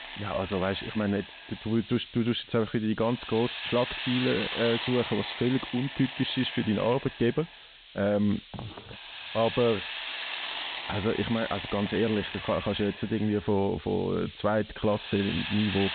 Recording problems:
high frequencies cut off; severe; nothing above 4 kHz
hiss; loud; throughout; 7 dB below the speech

